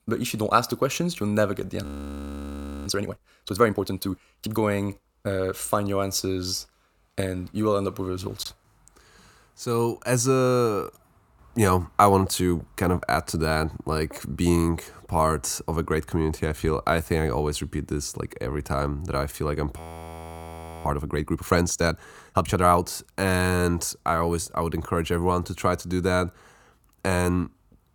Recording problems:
audio freezing; at 2 s for 1 s and at 20 s for 1 s

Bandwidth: 18 kHz